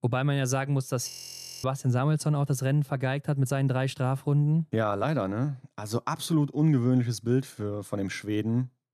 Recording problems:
audio freezing; at 1 s for 0.5 s

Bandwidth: 13.5 kHz